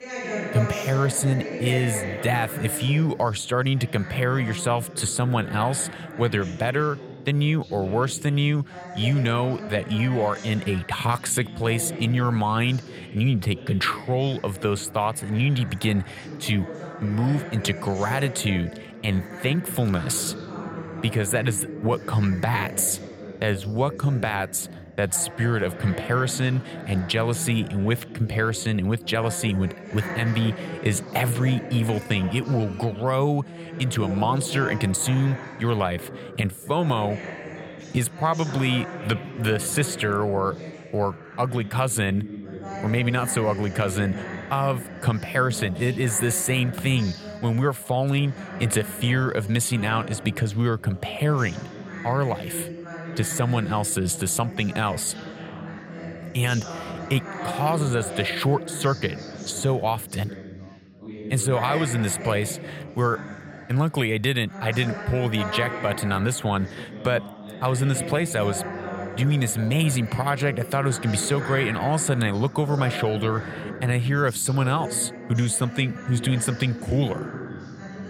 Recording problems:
background chatter; noticeable; throughout; 4 voices, 10 dB below the speech

